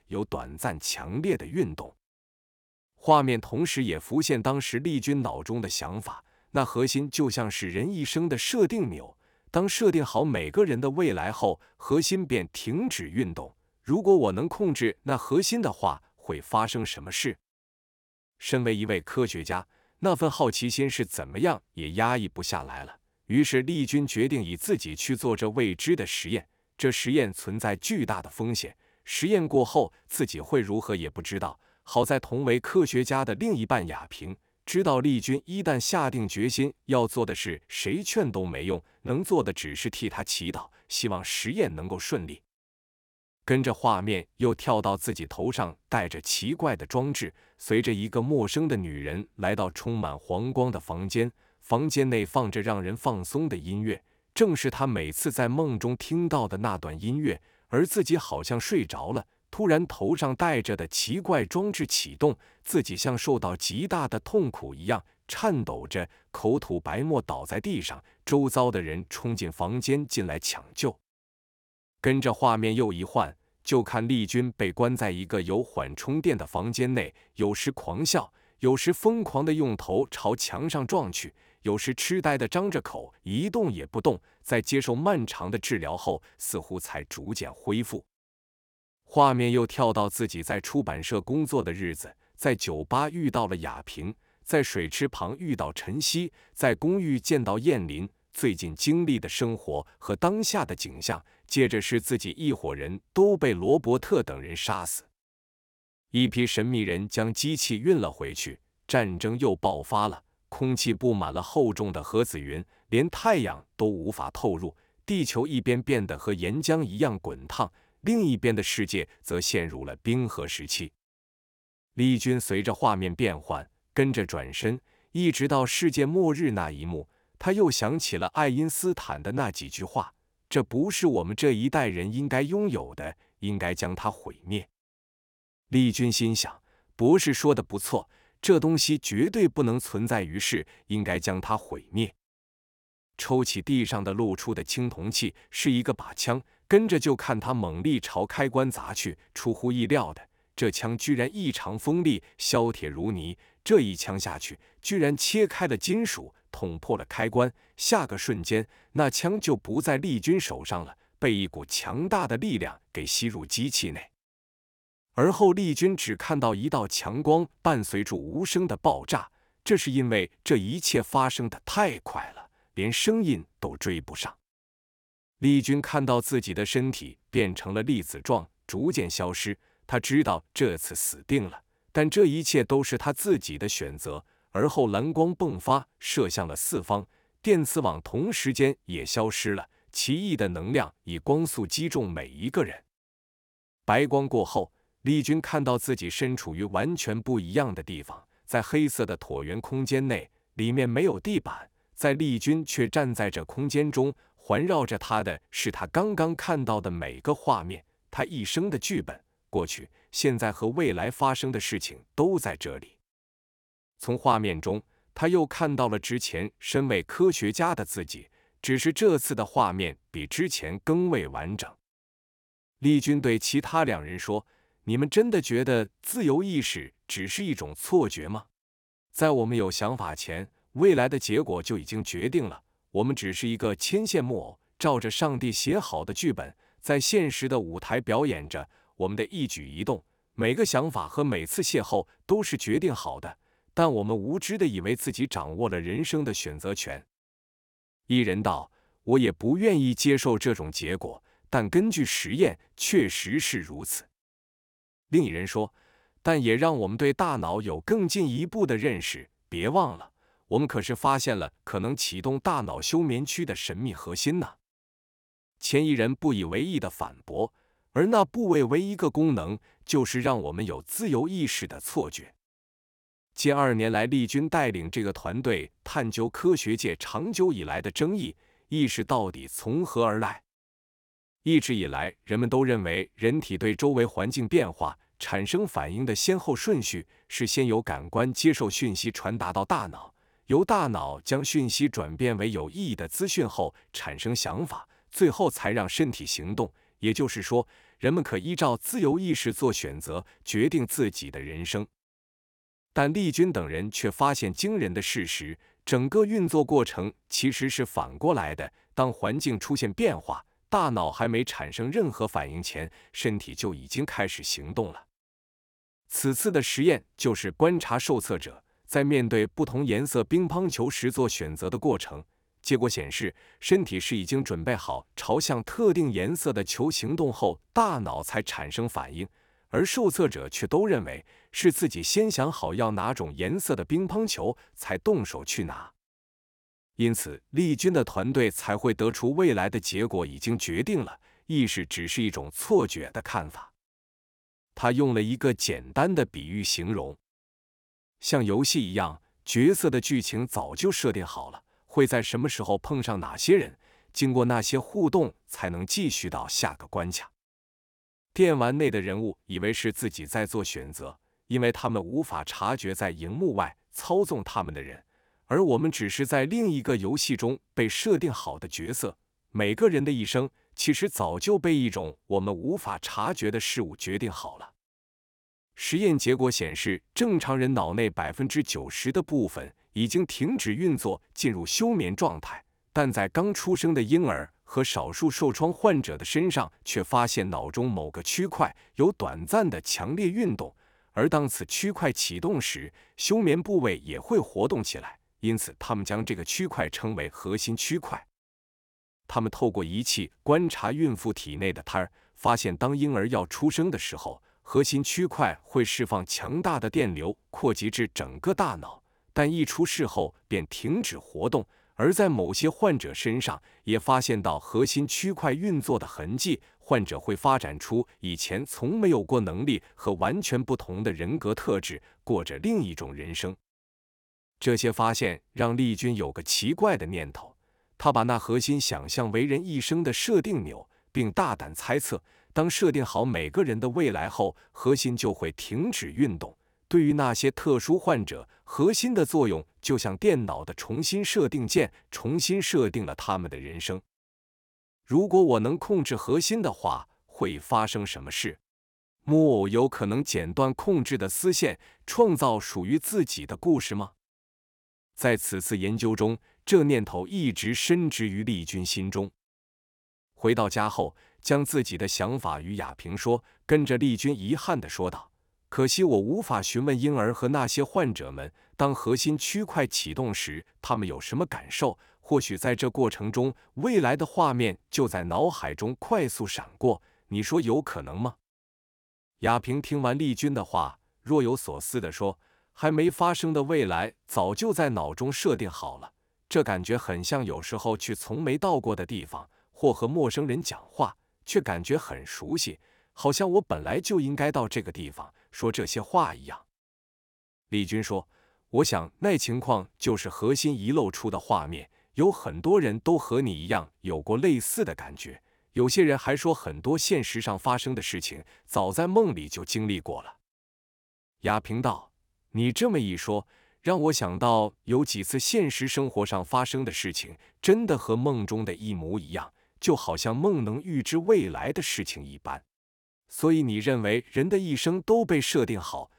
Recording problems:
none

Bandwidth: 18 kHz